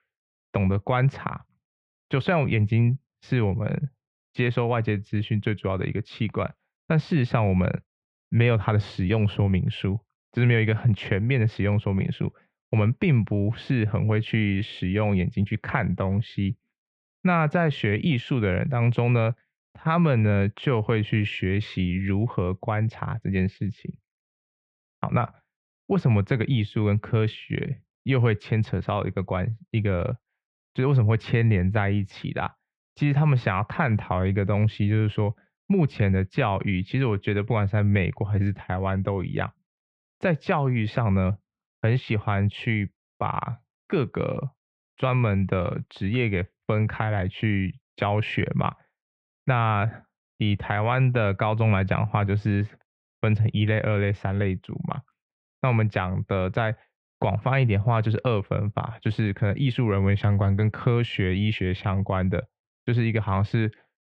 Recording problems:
muffled; very; fading above 2.5 kHz

